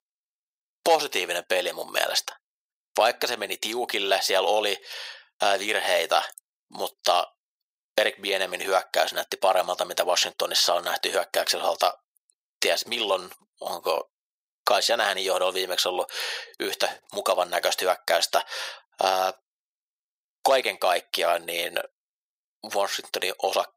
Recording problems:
thin; very; fading below 500 Hz

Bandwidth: 15.5 kHz